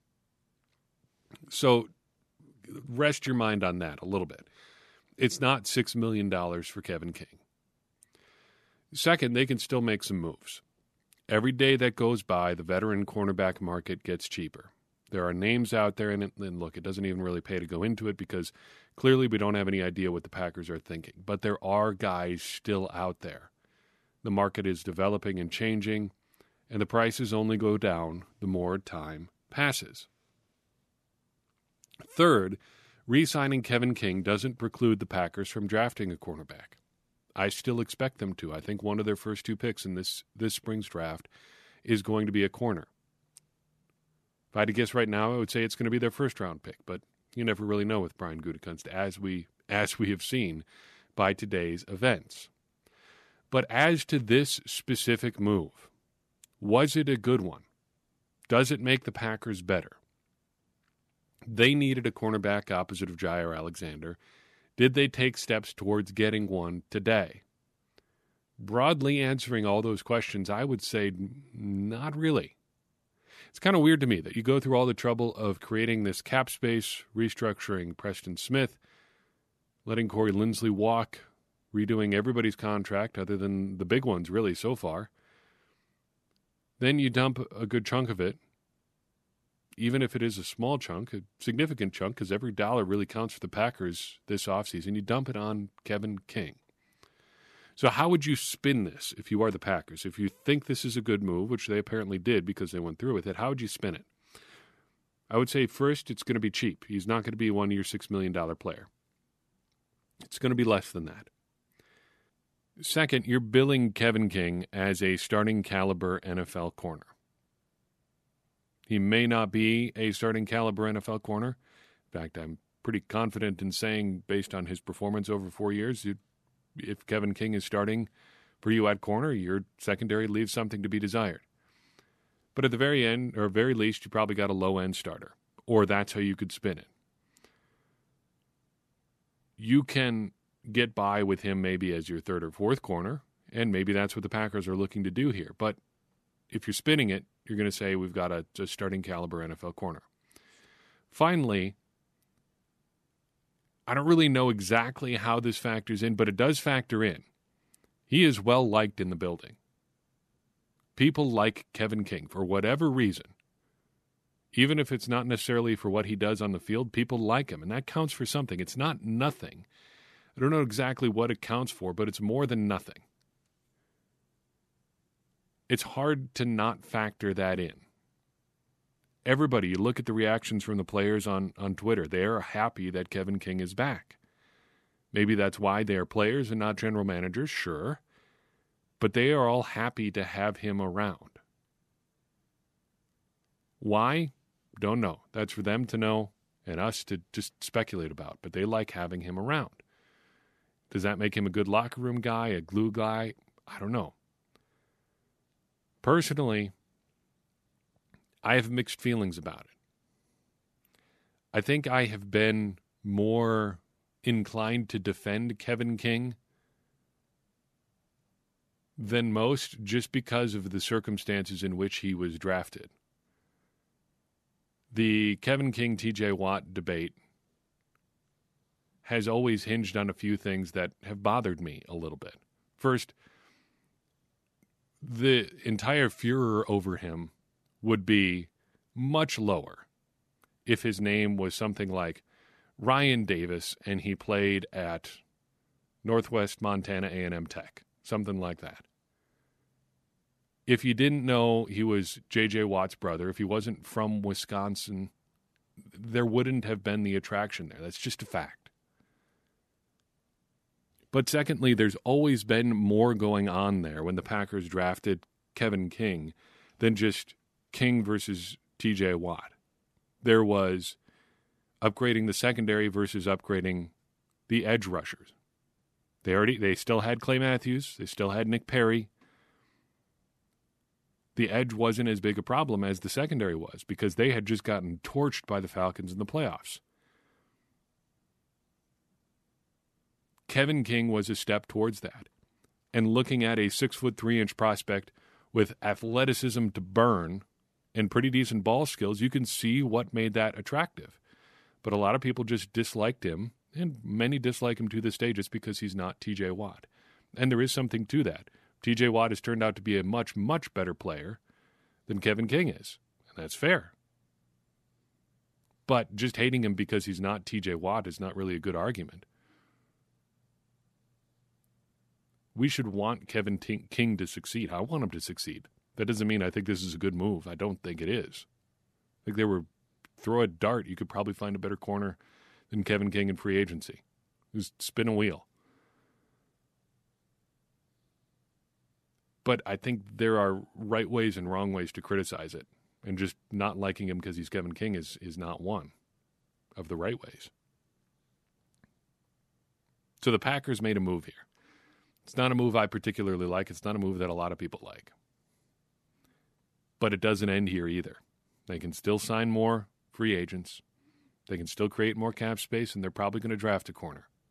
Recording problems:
none

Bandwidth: 13.5 kHz